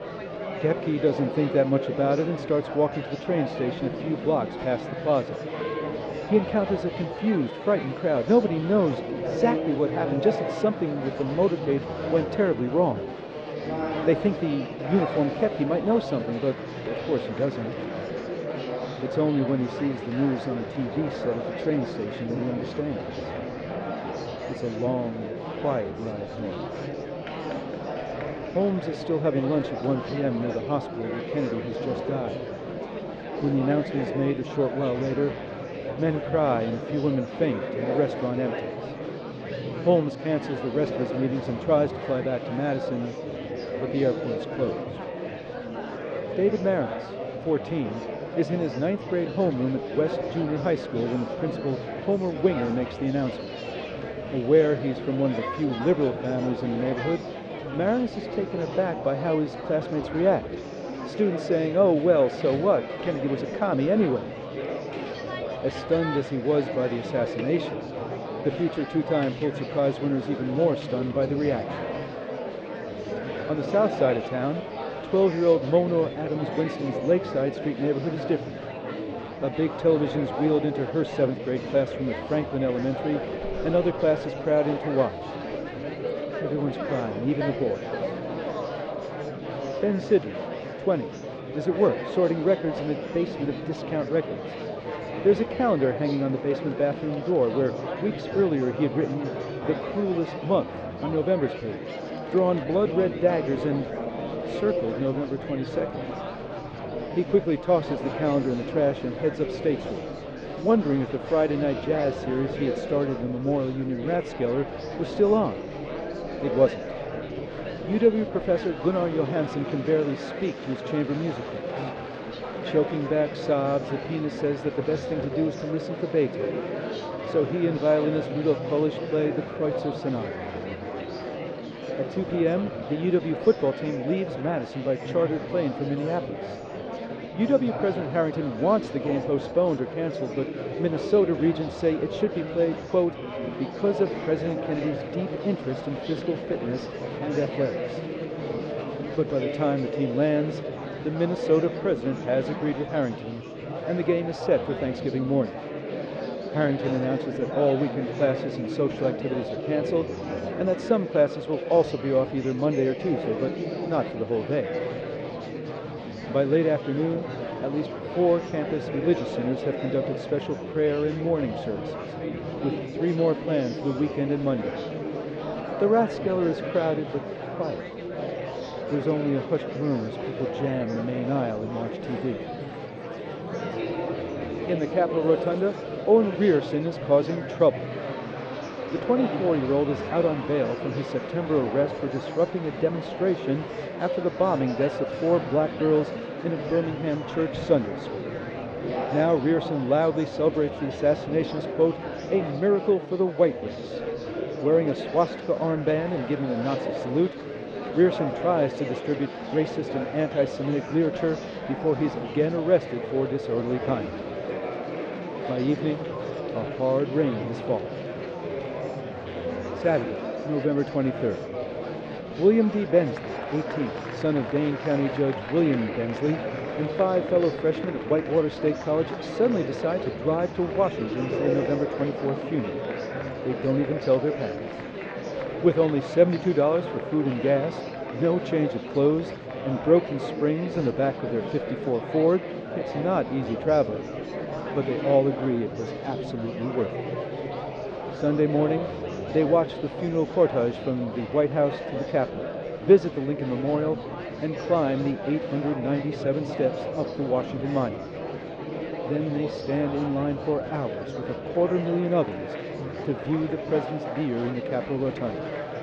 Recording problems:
muffled; very; fading above 4.5 kHz
murmuring crowd; loud; throughout; 6 dB below the speech

